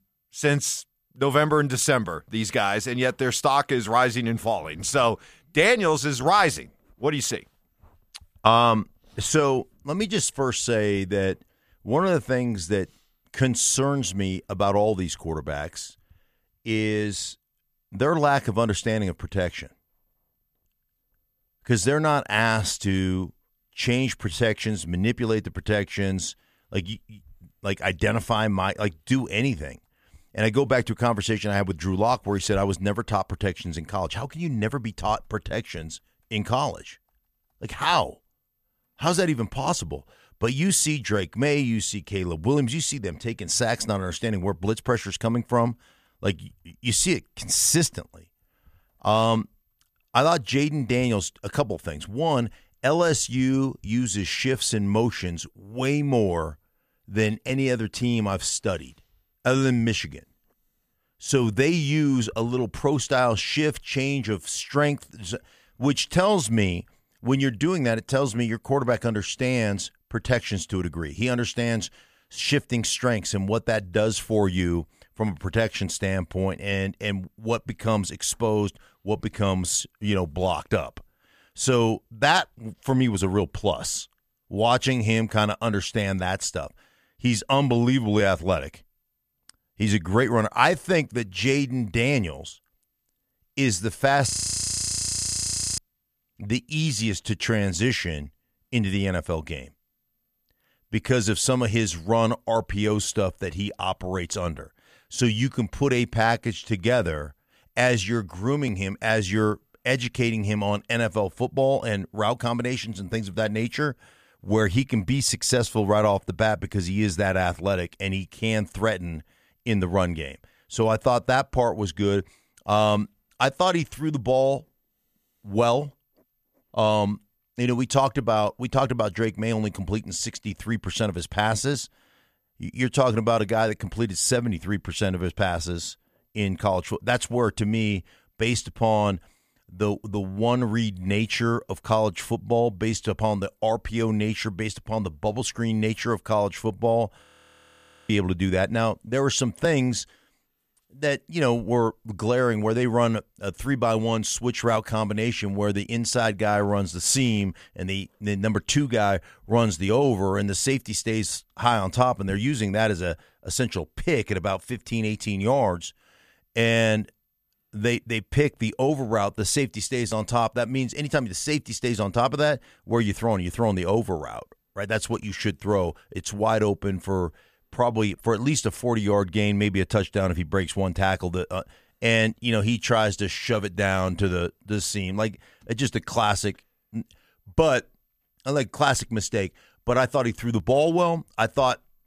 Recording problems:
audio freezing; at 1:34 for 1.5 s and at 2:27 for 1 s

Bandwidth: 14.5 kHz